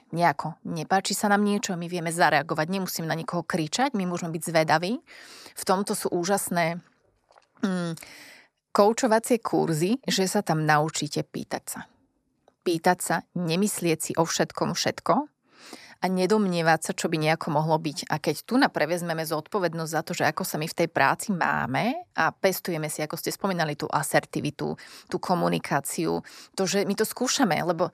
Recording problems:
none

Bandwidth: 14 kHz